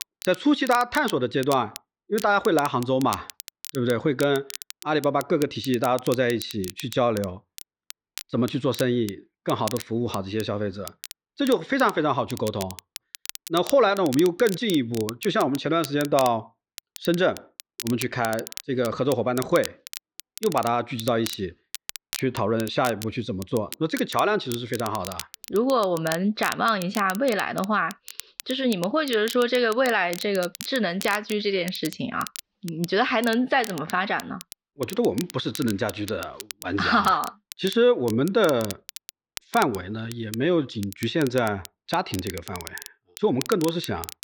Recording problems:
muffled; very slightly; fading above 4.5 kHz
crackle, like an old record; noticeable; 15 dB below the speech

